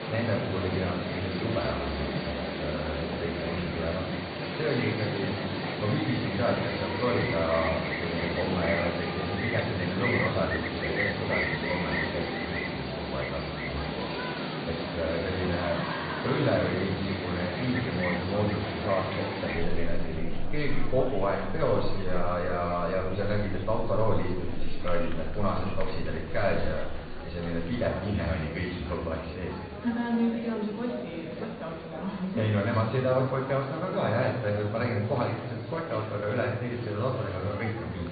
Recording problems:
off-mic speech; far
high frequencies cut off; severe; nothing above 4.5 kHz
room echo; noticeable; dies away in 0.8 s
animal sounds; loud; until 27 s; 2 dB below the speech
murmuring crowd; loud; throughout; 9 dB below the speech

